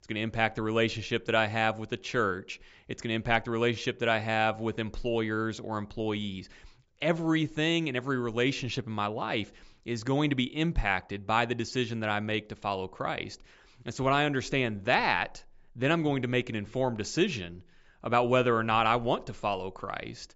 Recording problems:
high frequencies cut off; noticeable; nothing above 8 kHz

